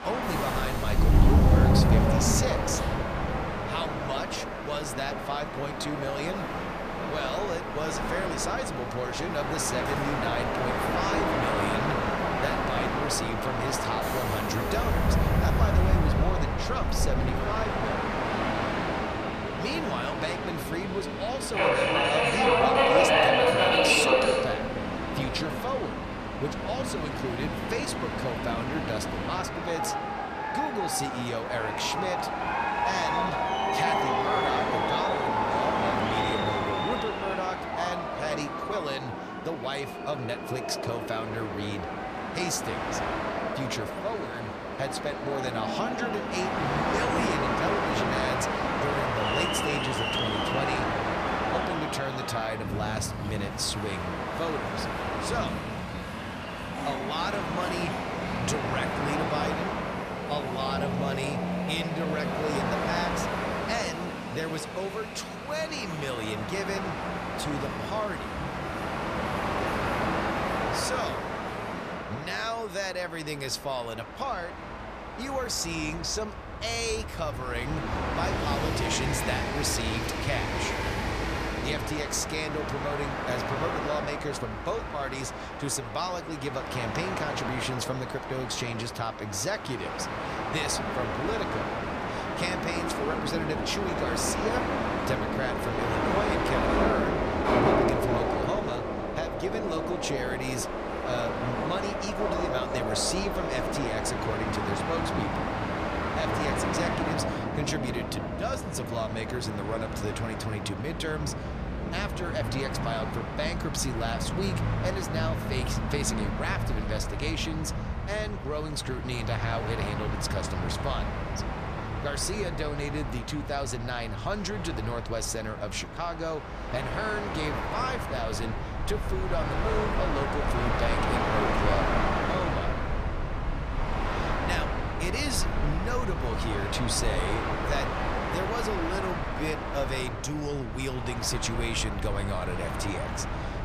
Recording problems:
train or aircraft noise; very loud; throughout; 4 dB above the speech

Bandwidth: 14.5 kHz